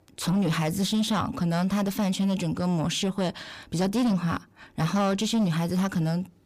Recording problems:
distortion; slight; 10 dB below the speech

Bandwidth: 15 kHz